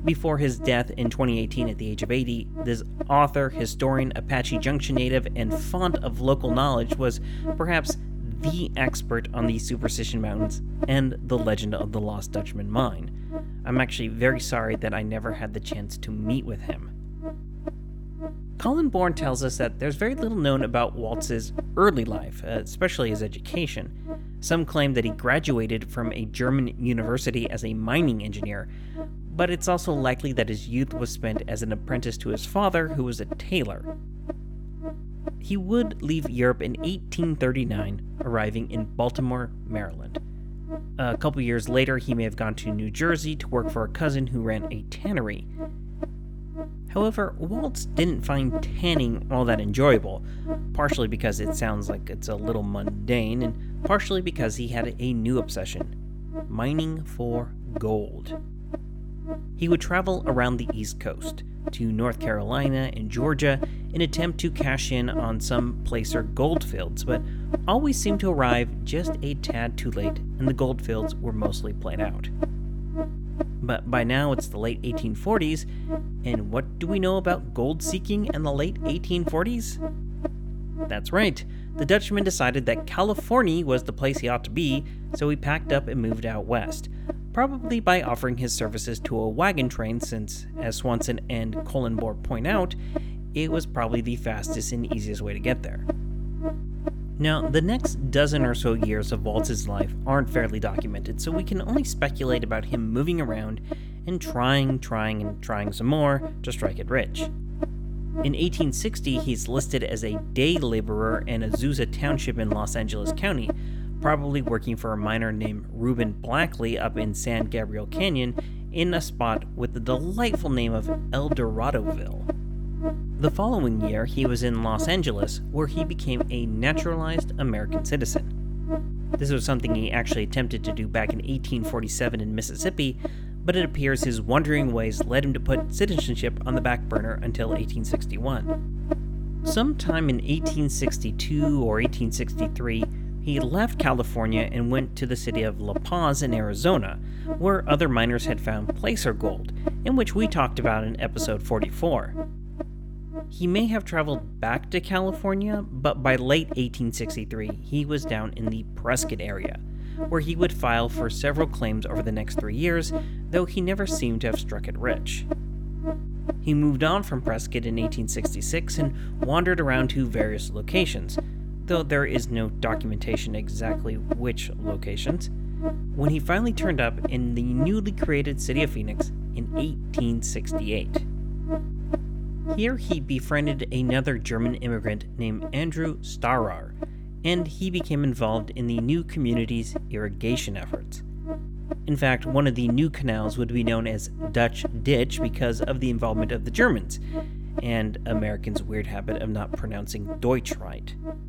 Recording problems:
electrical hum; loud; throughout; 50 Hz, 9 dB below the speech

